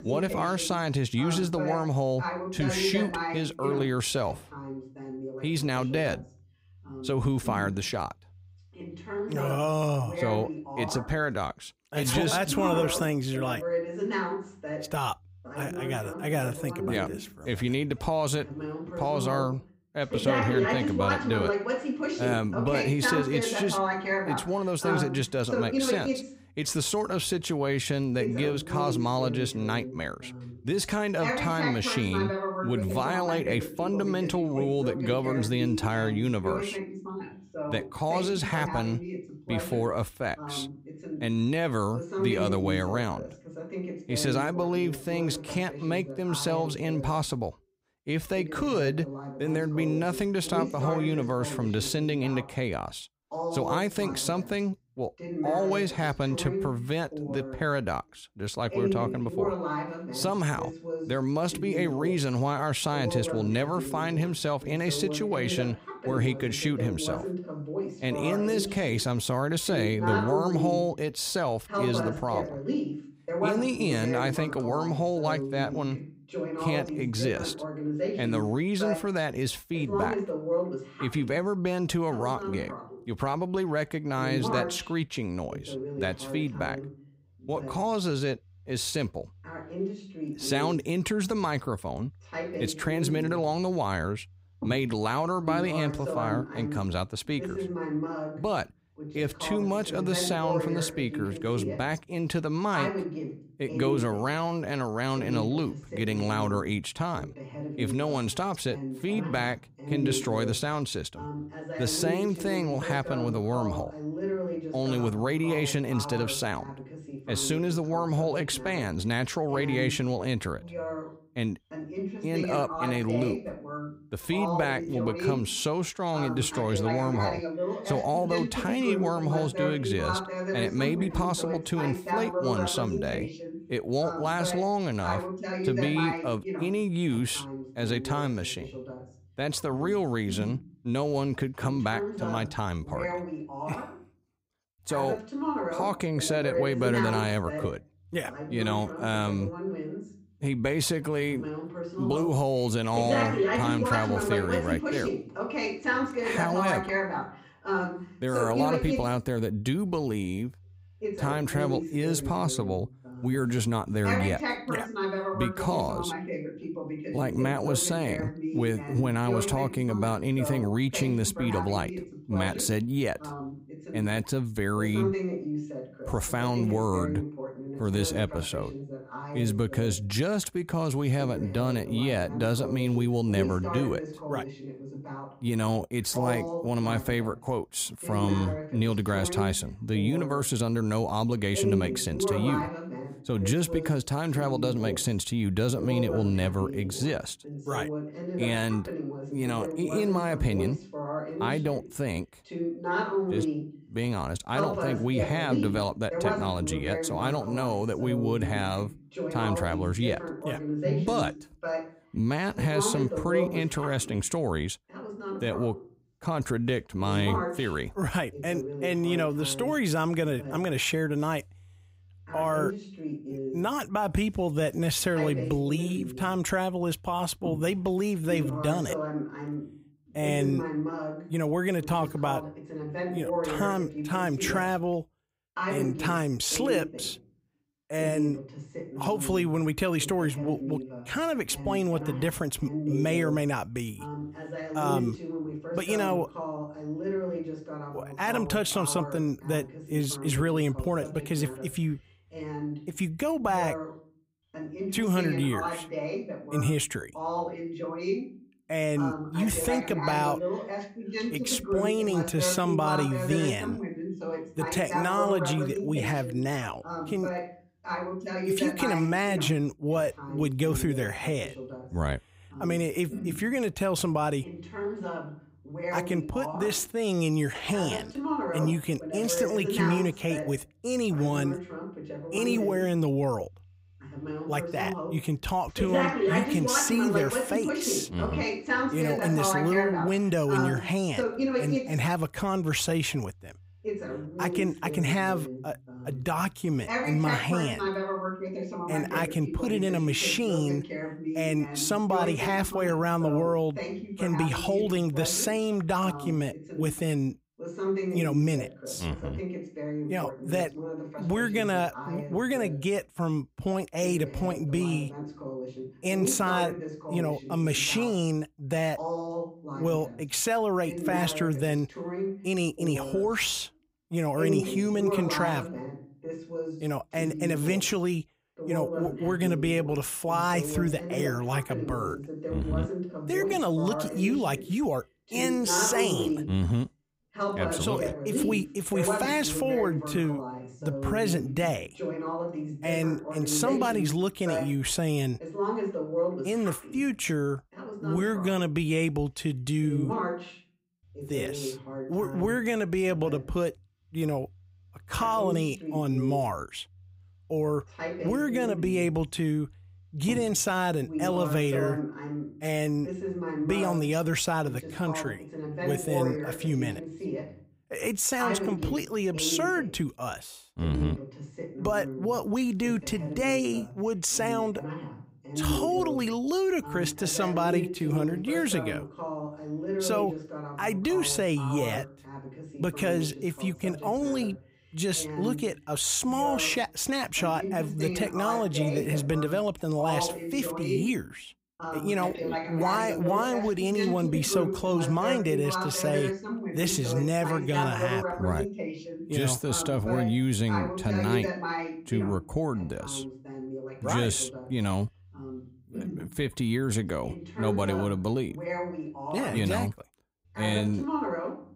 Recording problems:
voice in the background; loud; throughout; 5 dB below the speech

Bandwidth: 15.5 kHz